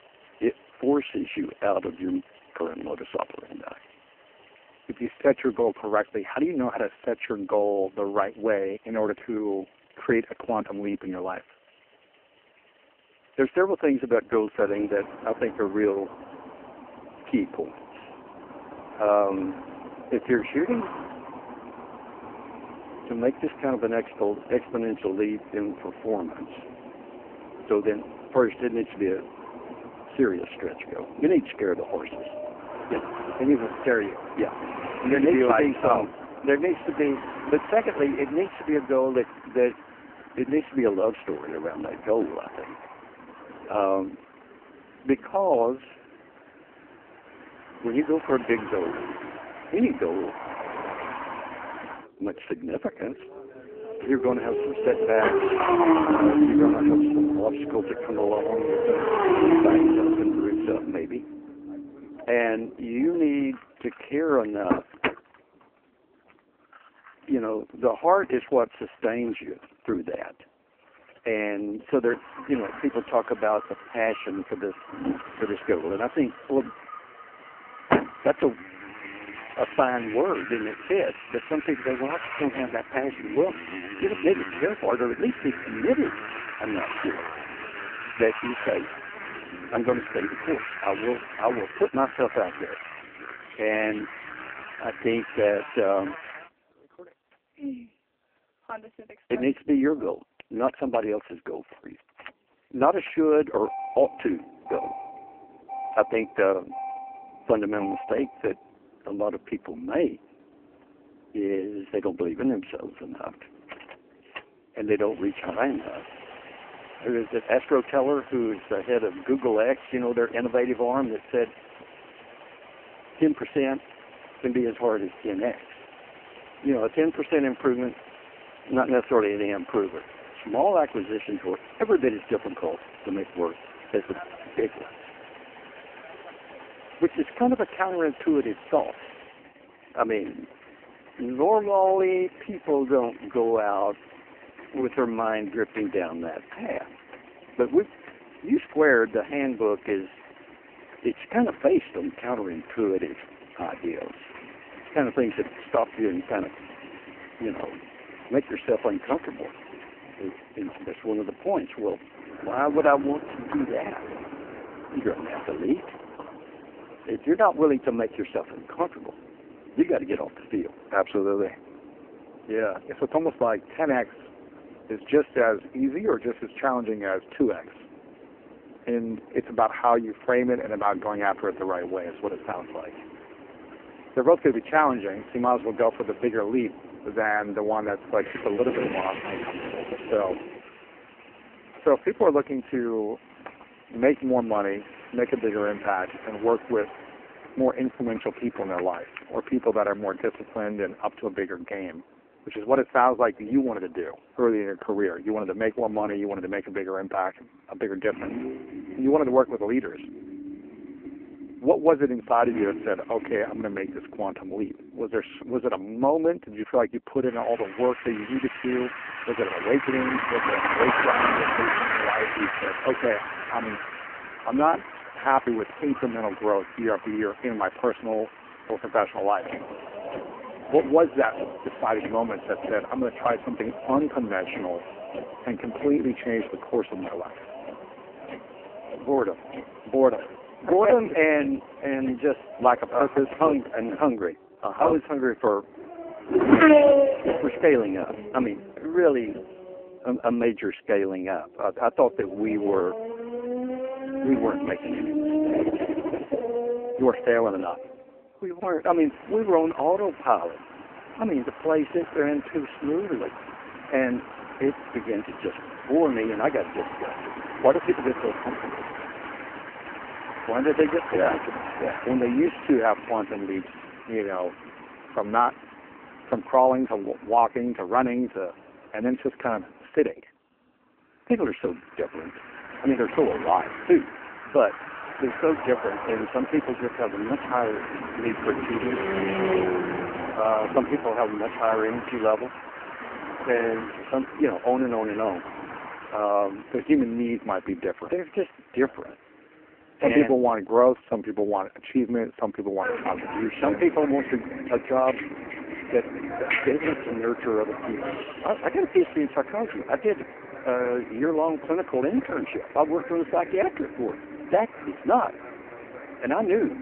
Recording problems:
phone-call audio; poor line
traffic noise; loud; throughout; 5 dB below the speech

